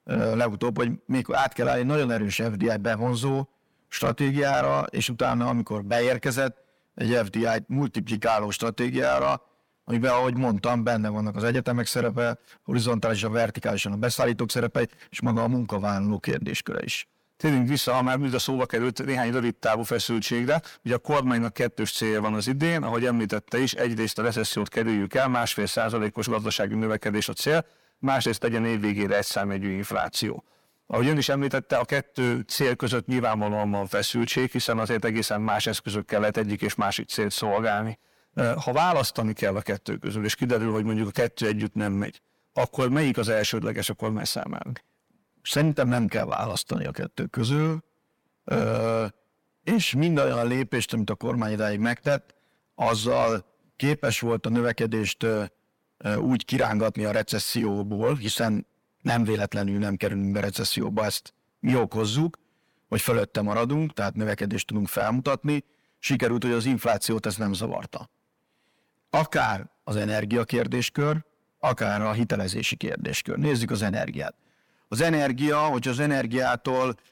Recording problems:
distortion; slight; 10 dB below the speech

